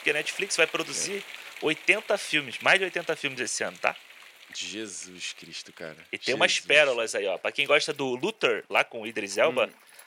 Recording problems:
thin; very; fading below 500 Hz
rain or running water; noticeable; throughout; 20 dB below the speech

